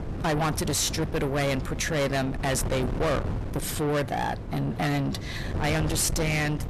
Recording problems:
distortion; heavy; 6 dB below the speech
wind noise on the microphone; heavy; 10 dB below the speech

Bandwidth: 13.5 kHz